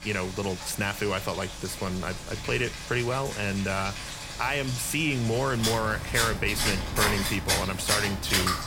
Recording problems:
rain or running water; loud; throughout; 2 dB below the speech
wind noise on the microphone; occasional gusts; from 1.5 to 4 s and from 5.5 to 7.5 s; 20 dB below the speech

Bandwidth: 16.5 kHz